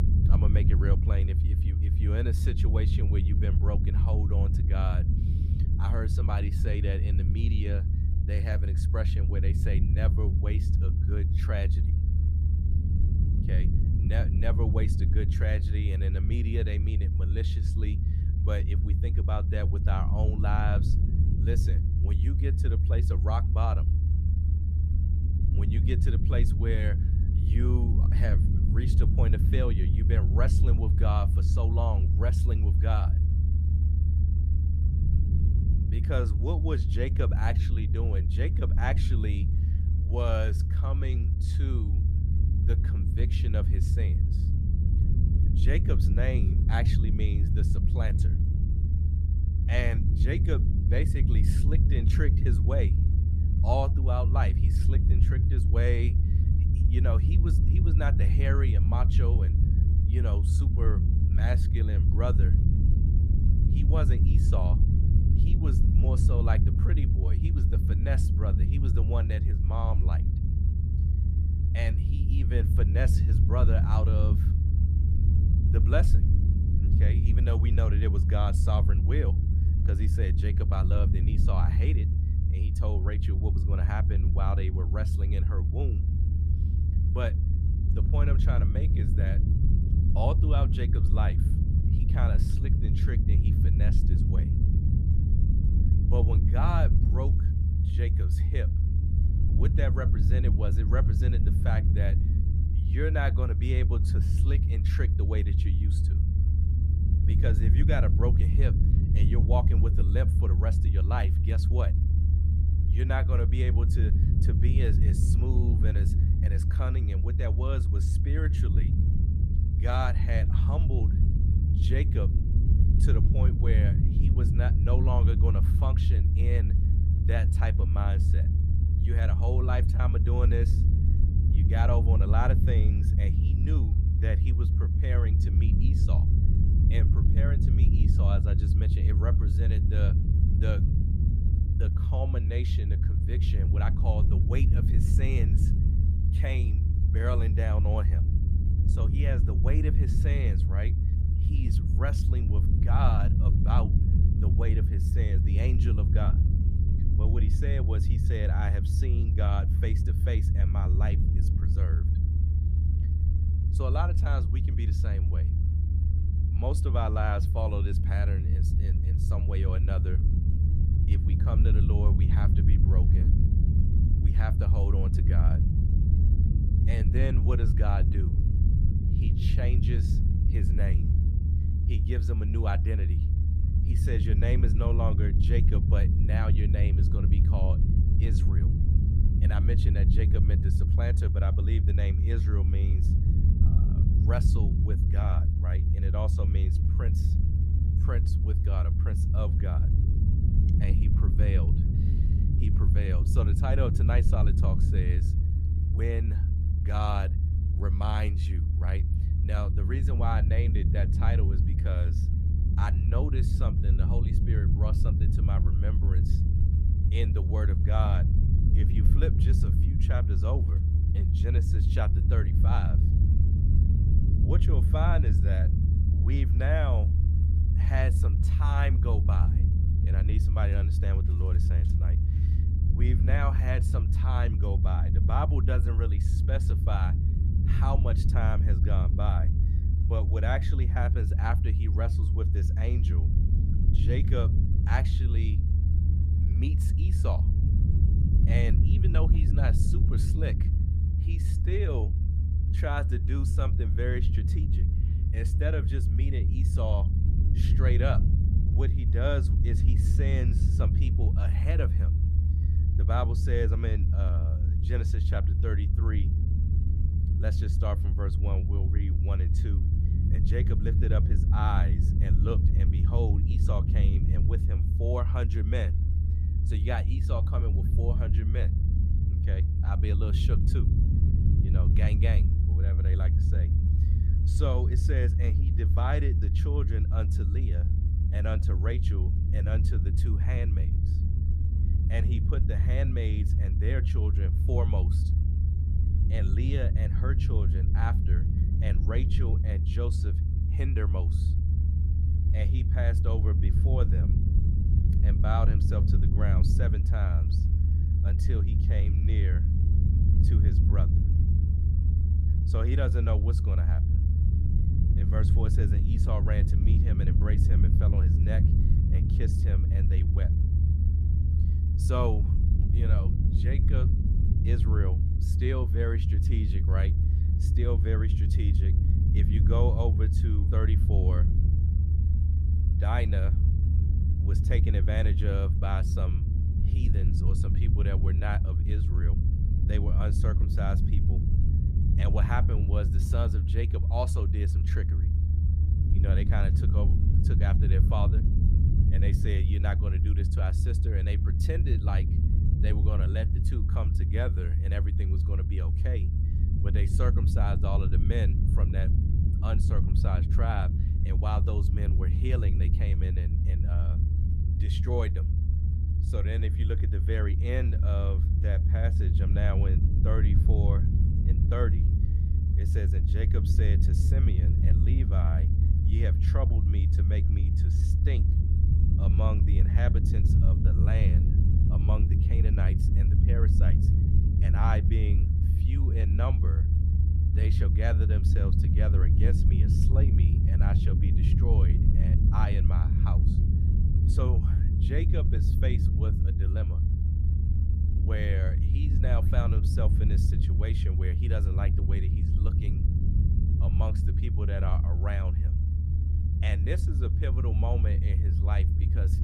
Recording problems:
low rumble; loud; throughout; 2 dB below the speech

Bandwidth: 15 kHz